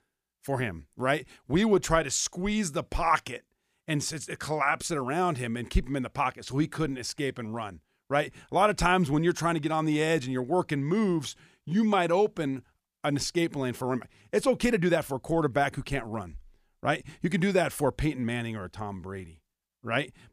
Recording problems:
none

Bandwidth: 15 kHz